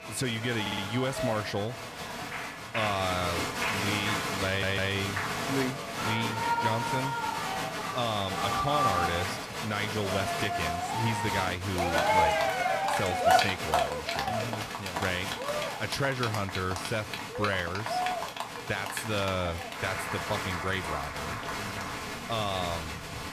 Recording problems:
crowd noise; very loud; throughout; 2 dB above the speech
audio stuttering; at 0.5 s and at 4.5 s

